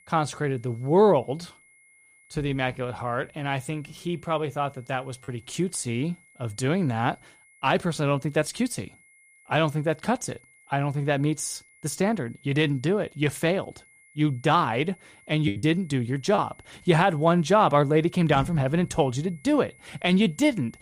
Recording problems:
high-pitched whine; faint; throughout; 2 kHz, 30 dB below the speech
choppy; very; at 5 s and at 15 s; 8% of the speech affected

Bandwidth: 14.5 kHz